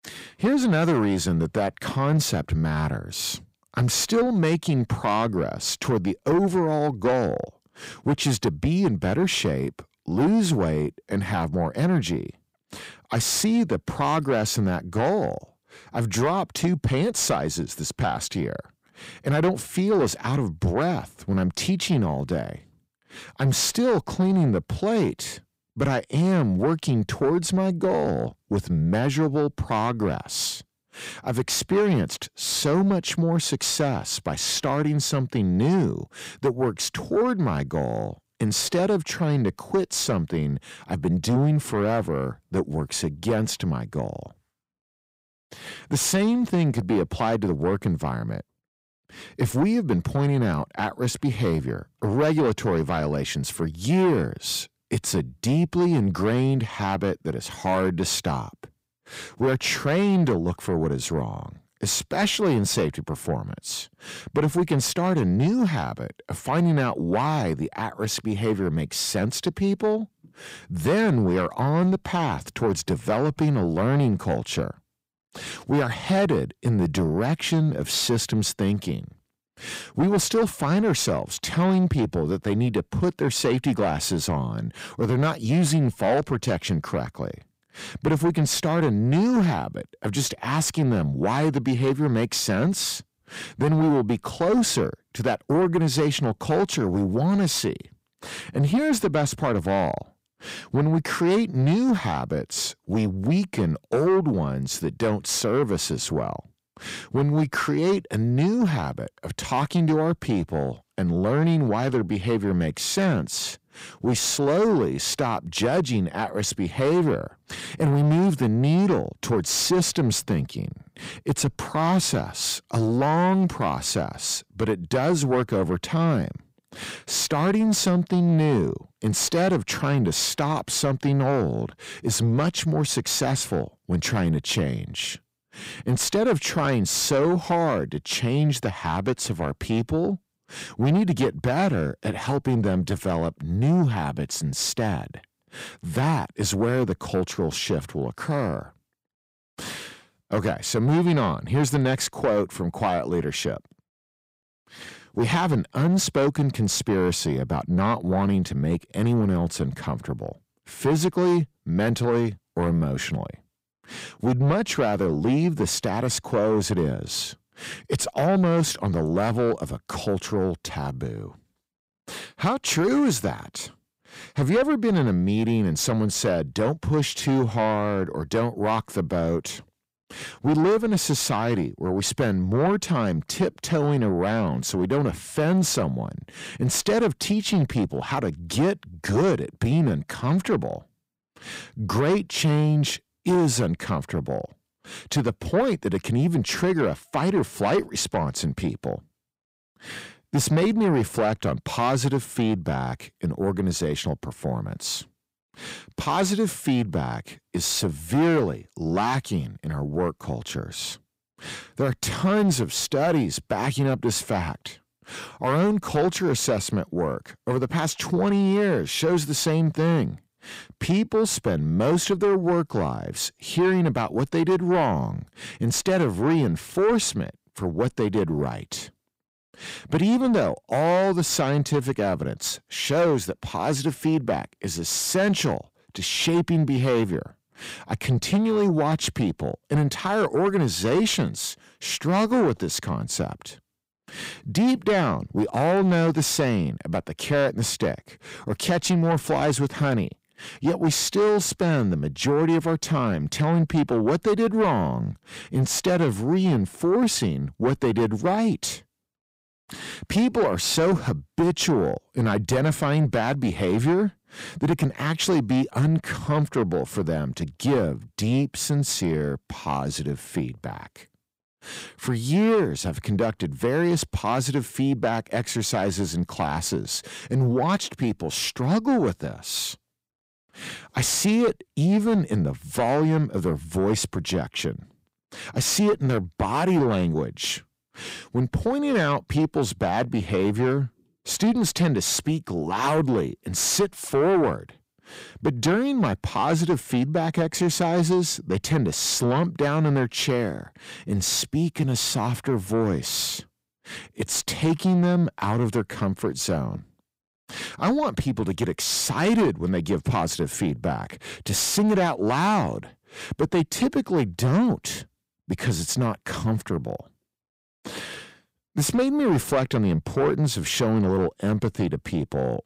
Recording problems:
distortion; slight; 10 dB below the speech

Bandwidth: 15.5 kHz